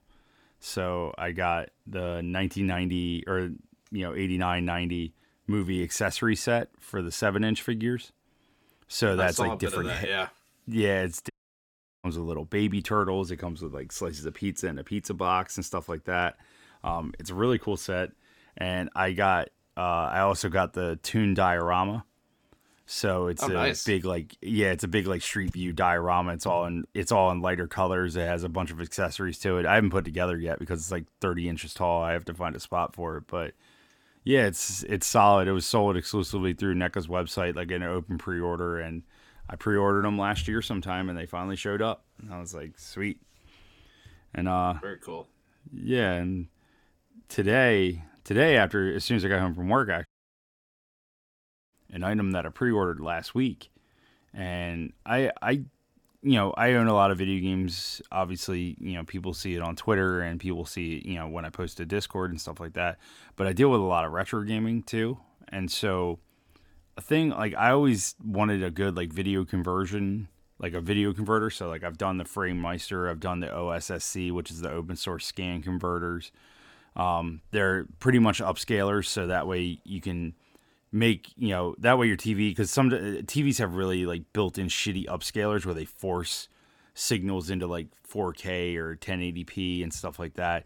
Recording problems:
audio cutting out; at 11 s for 0.5 s and at 50 s for 1.5 s

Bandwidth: 17.5 kHz